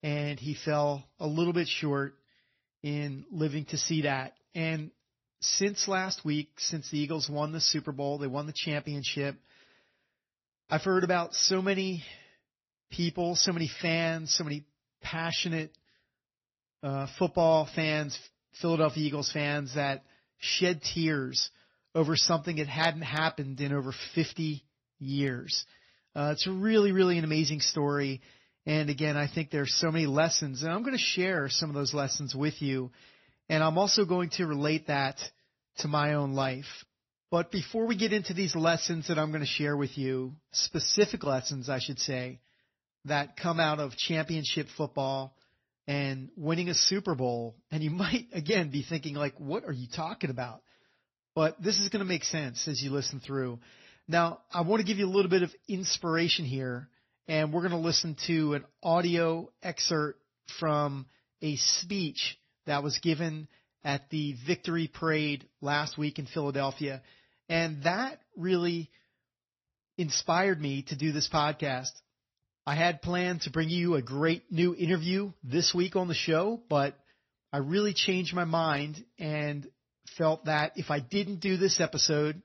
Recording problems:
garbled, watery; slightly; nothing above 6 kHz

